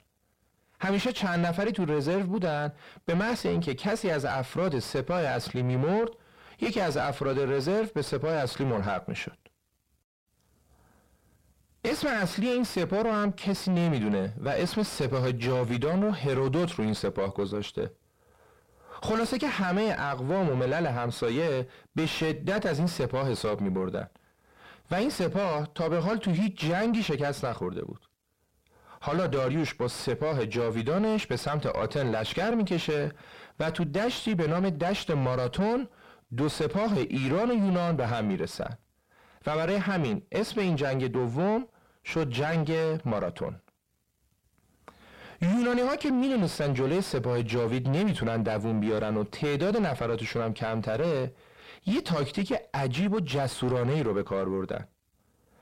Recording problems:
distortion; heavy; 7 dB below the speech

